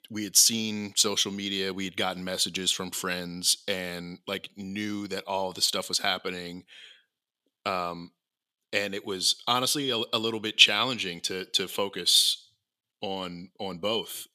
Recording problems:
thin; somewhat; fading below 800 Hz

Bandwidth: 14.5 kHz